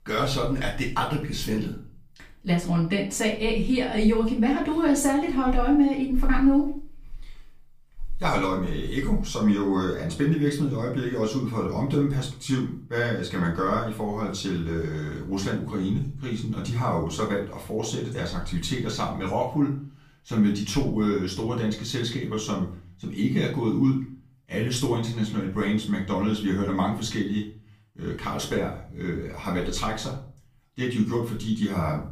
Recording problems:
off-mic speech; far
room echo; slight; dies away in 0.4 s

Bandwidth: 15 kHz